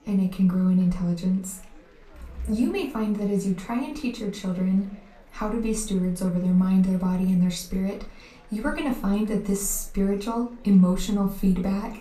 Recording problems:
off-mic speech; far
room echo; slight; dies away in 0.3 s
chatter from many people; faint; throughout; 30 dB below the speech

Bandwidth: 14.5 kHz